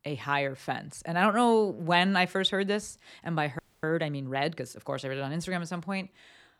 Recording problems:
audio freezing; at 3.5 s

